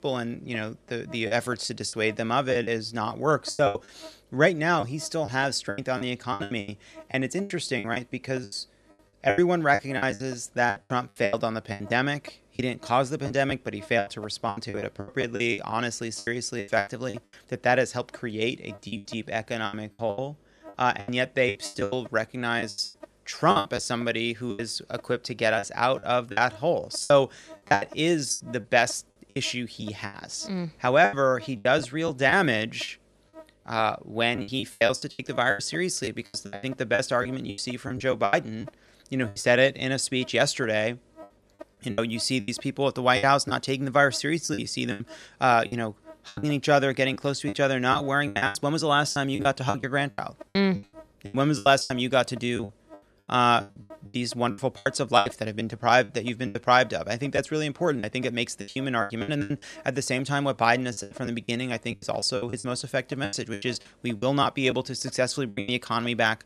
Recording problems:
electrical hum; faint; throughout; 50 Hz, 25 dB below the speech
choppy; very; 15% of the speech affected

